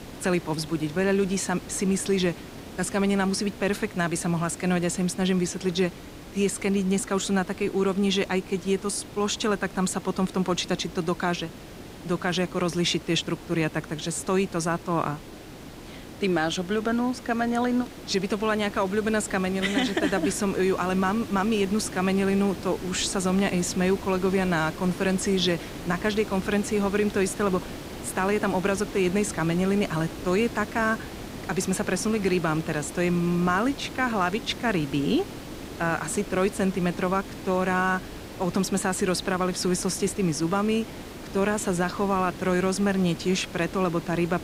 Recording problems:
hiss; noticeable; throughout; 15 dB below the speech

